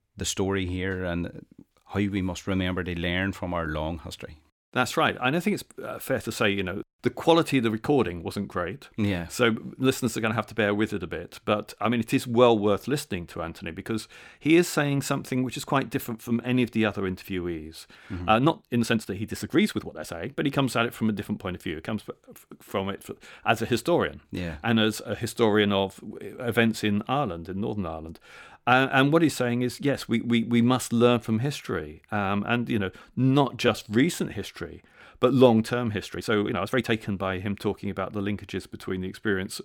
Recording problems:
uneven, jittery; strongly; from 18 to 37 s

